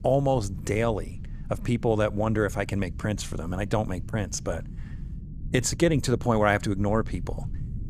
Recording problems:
low rumble; faint; throughout; 25 dB below the speech

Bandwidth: 15 kHz